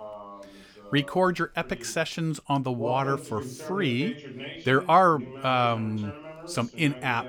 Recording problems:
voice in the background; noticeable; throughout; 15 dB below the speech

